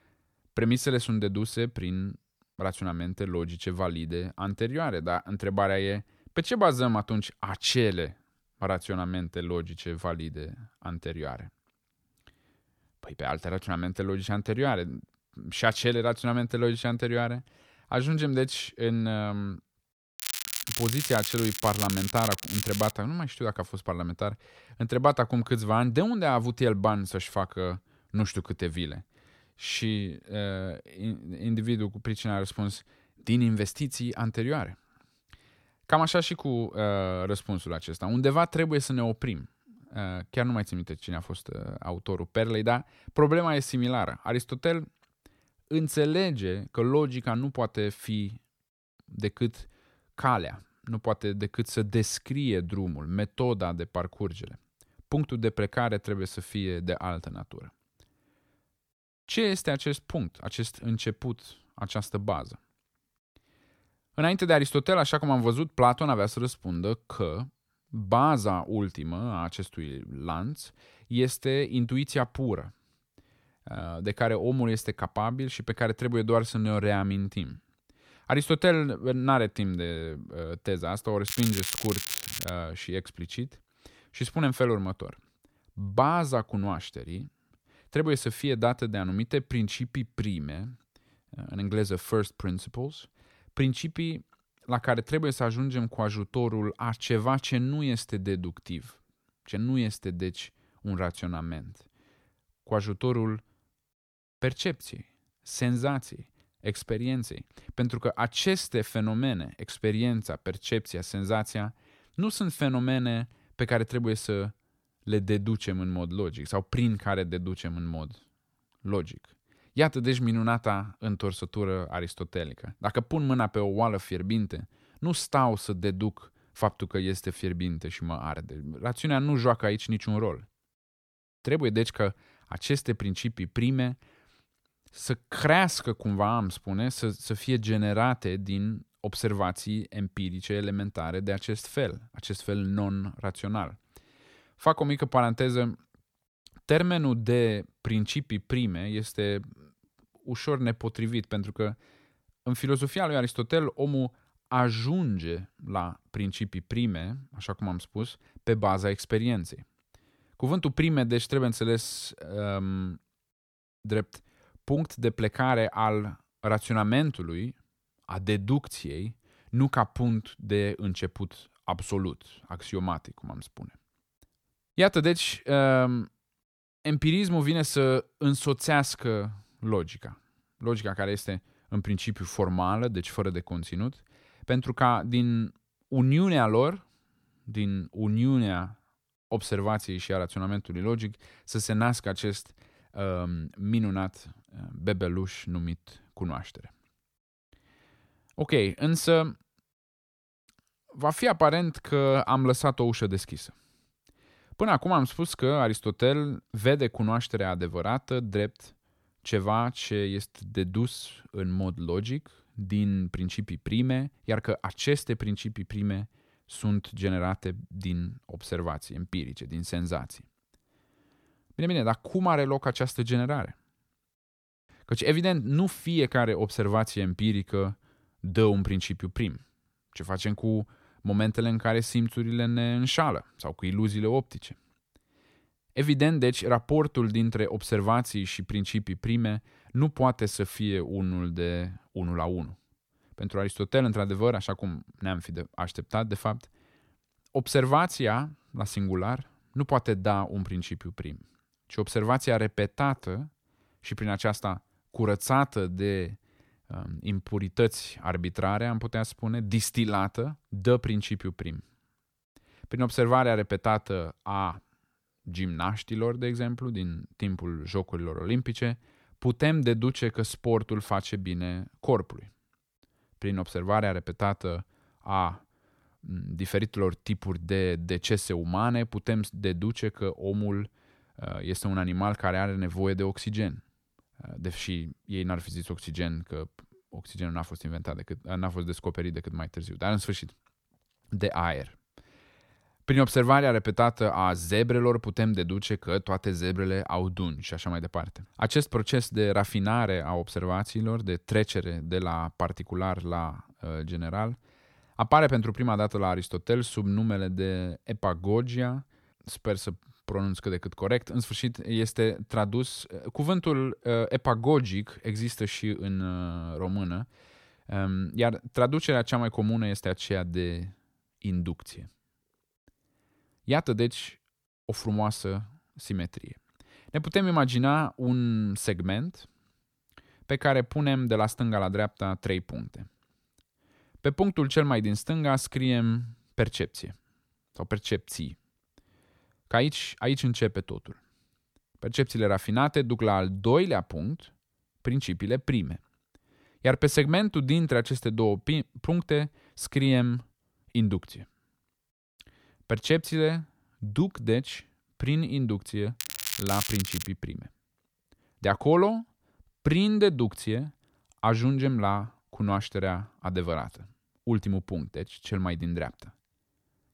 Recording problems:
crackling; loud; from 20 to 23 s, from 1:21 to 1:22 and from 5:56 to 5:57; 4 dB below the speech

